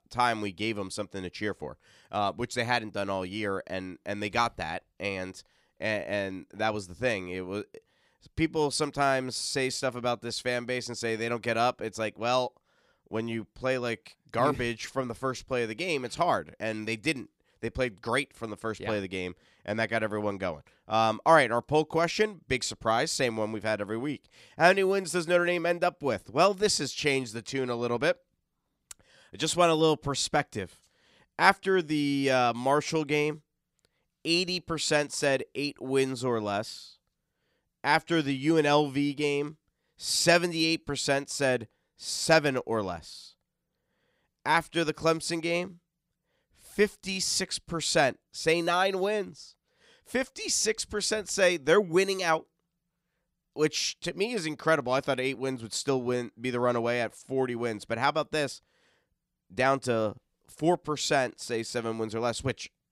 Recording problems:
none

